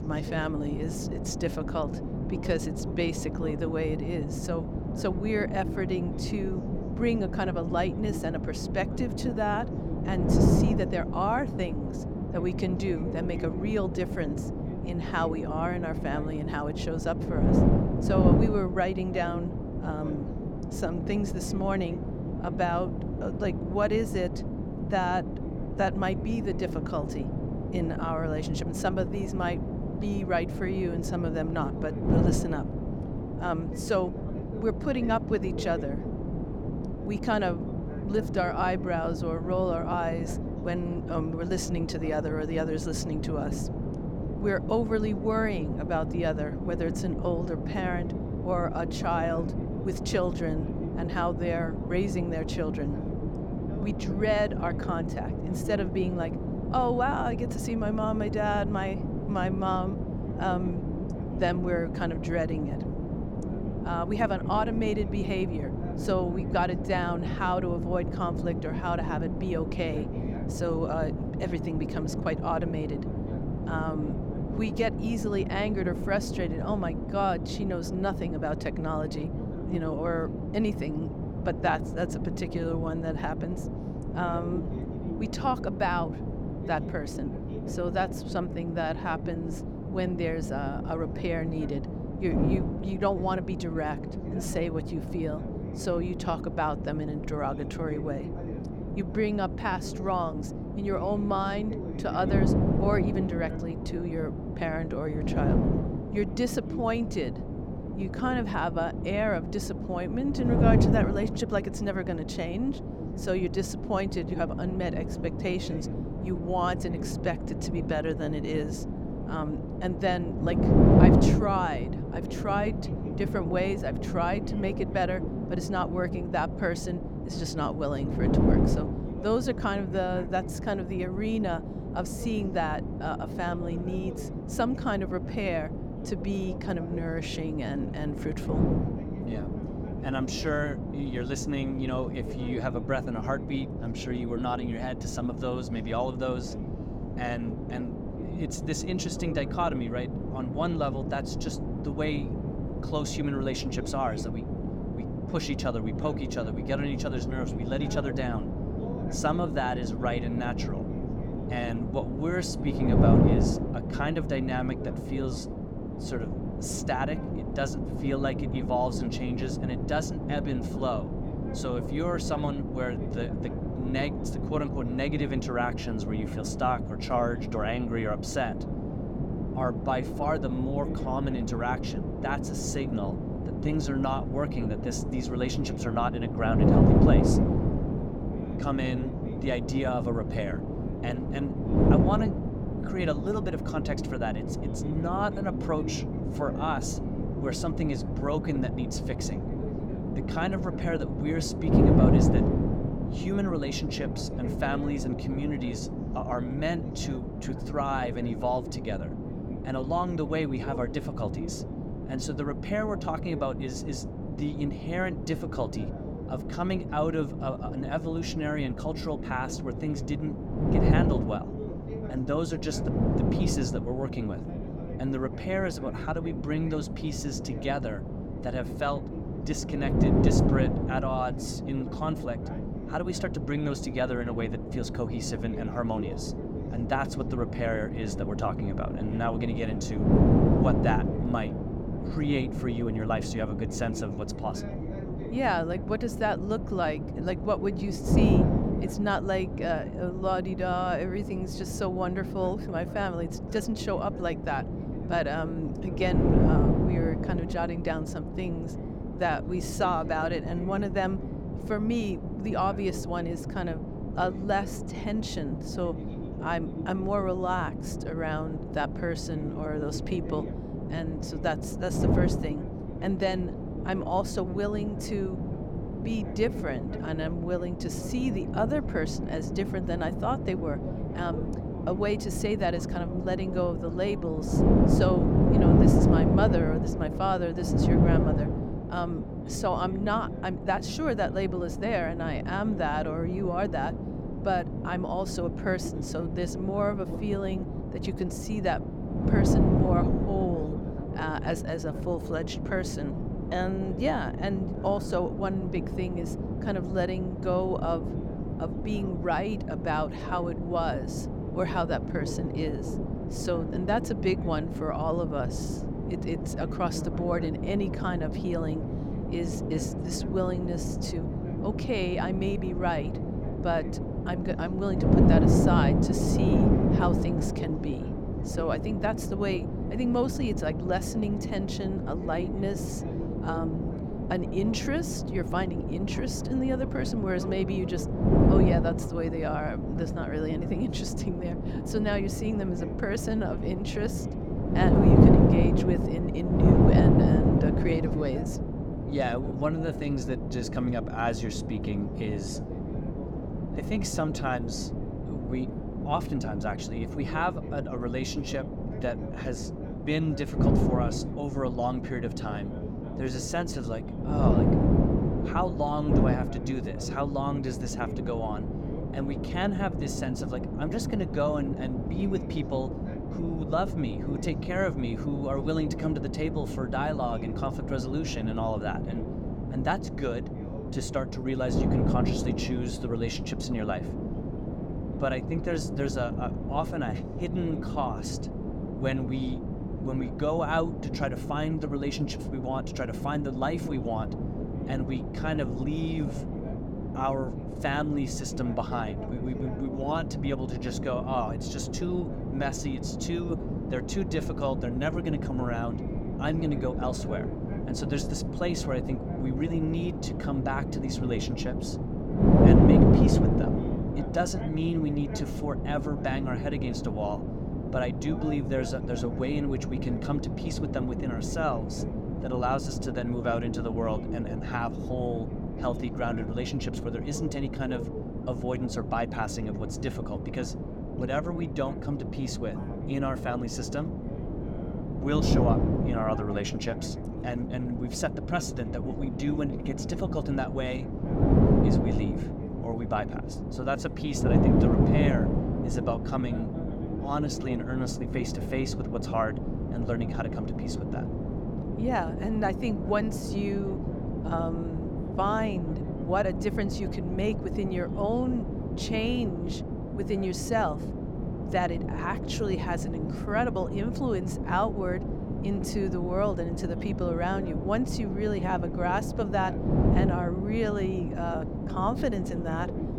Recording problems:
wind noise on the microphone; heavy; 4 dB below the speech
voice in the background; noticeable; throughout; 15 dB below the speech

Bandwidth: 17.5 kHz